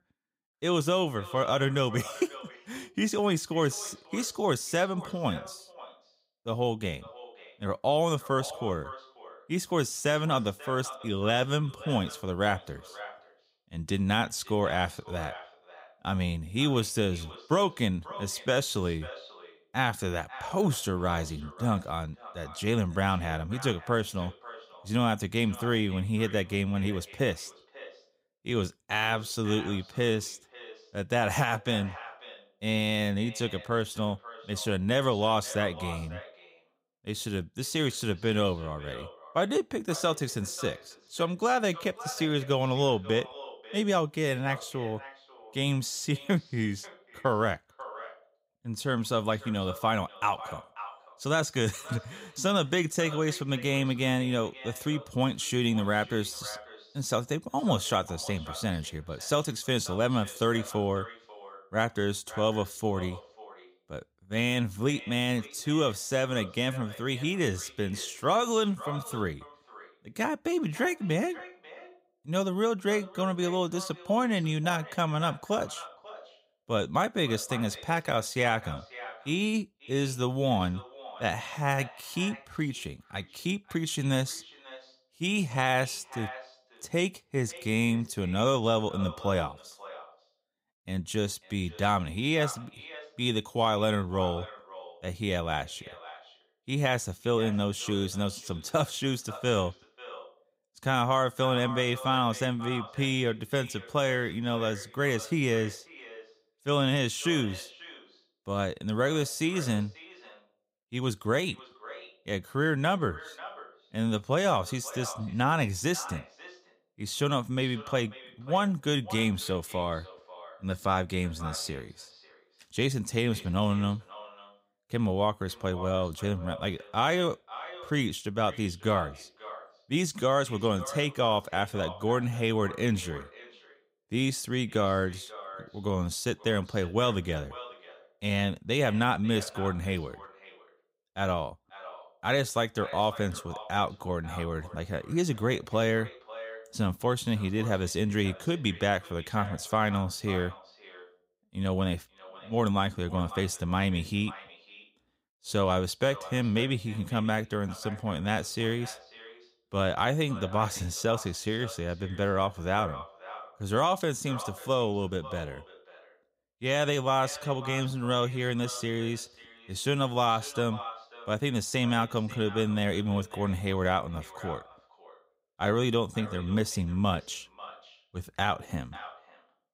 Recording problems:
echo of what is said; noticeable; throughout; 540 ms later, 15 dB below the speech

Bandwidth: 15.5 kHz